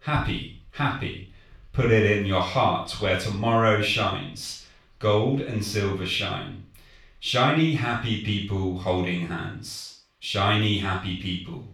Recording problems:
off-mic speech; far
room echo; noticeable; dies away in 0.4 s

